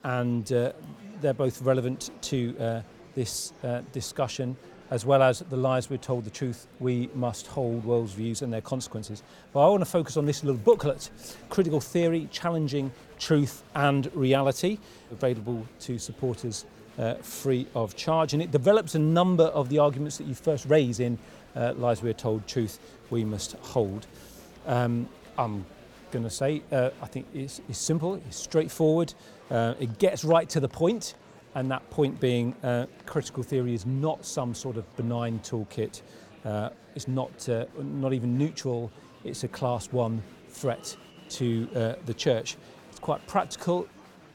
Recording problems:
murmuring crowd; faint; throughout; 25 dB below the speech

